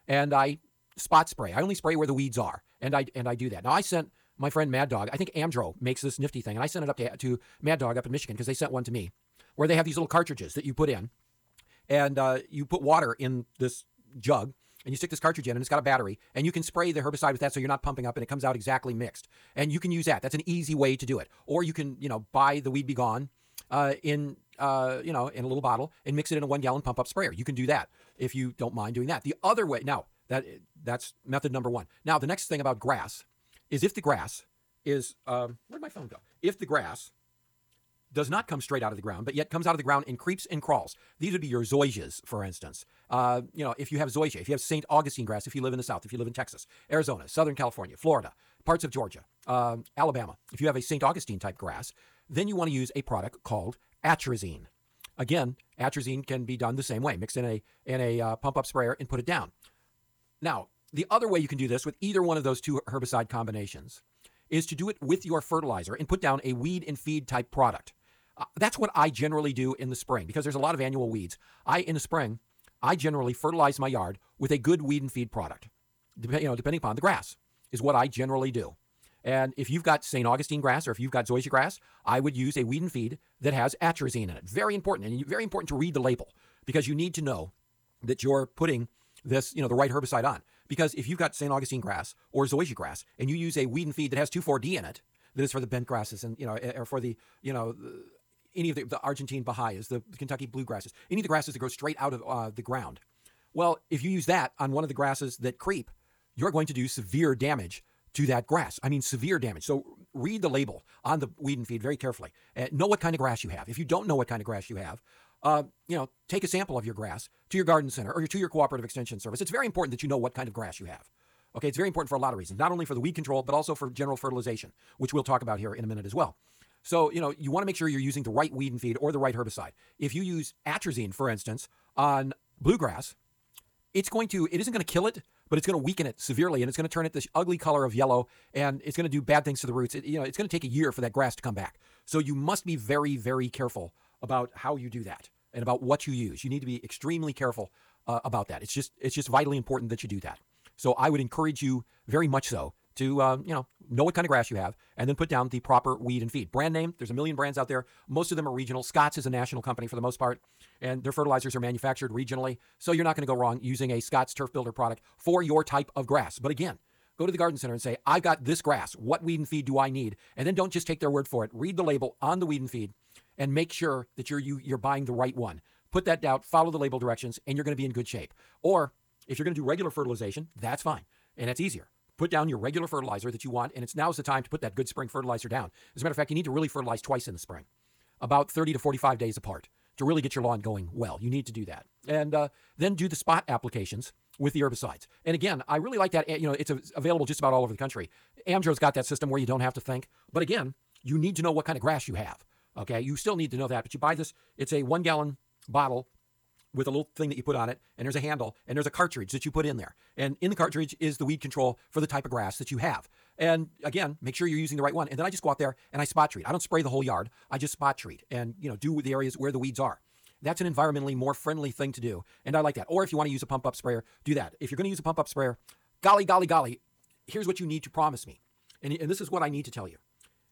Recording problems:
wrong speed, natural pitch; too fast; 1.6 times normal speed

